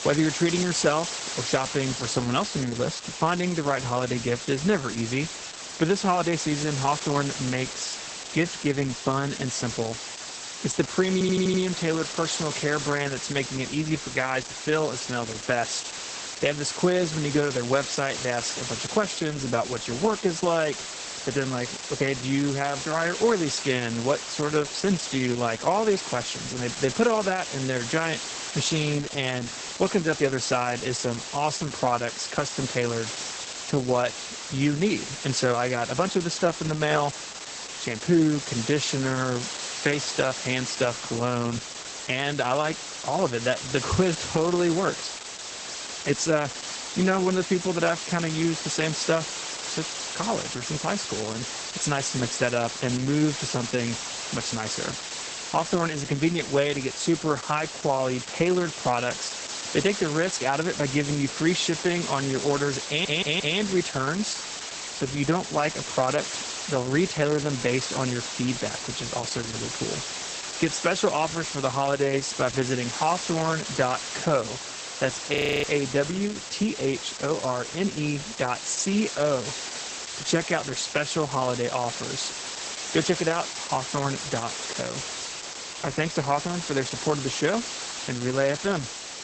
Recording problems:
garbled, watery; badly; nothing above 8 kHz
hiss; loud; throughout; 7 dB below the speech
audio stuttering; at 11 s and at 1:03
audio freezing; at 1:15

